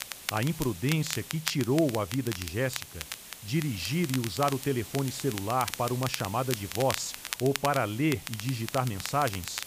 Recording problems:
crackle, like an old record; loud; 8 dB below the speech
hiss; noticeable; throughout; 15 dB below the speech

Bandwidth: 15 kHz